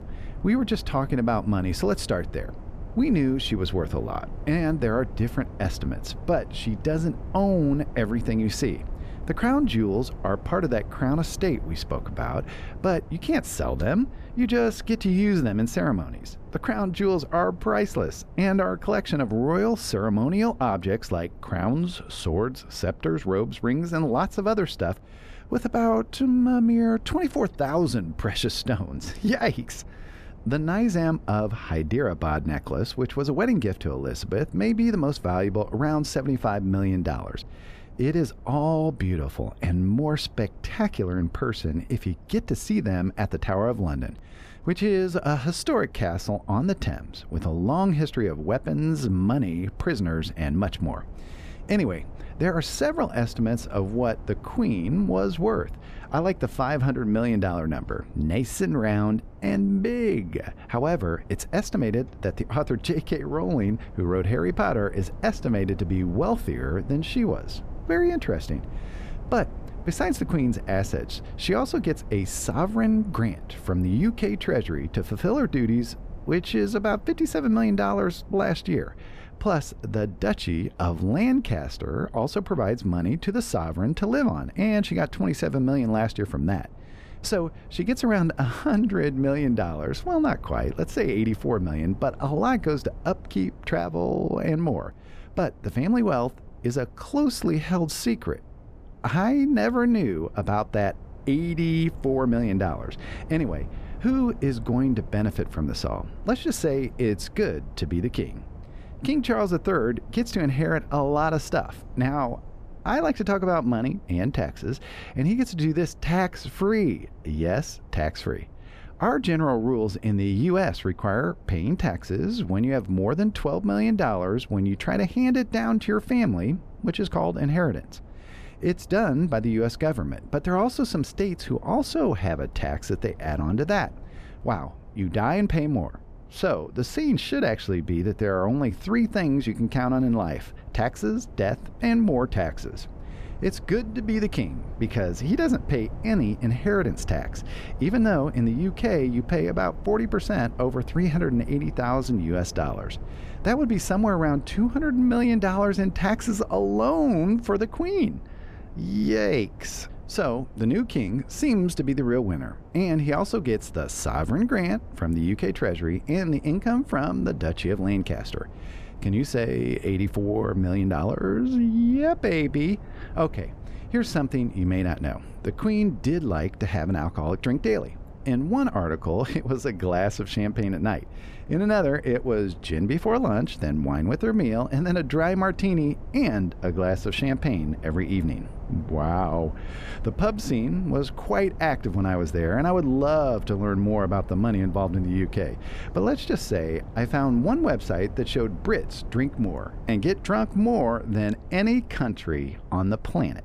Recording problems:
low rumble; faint; throughout; 25 dB below the speech

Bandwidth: 14.5 kHz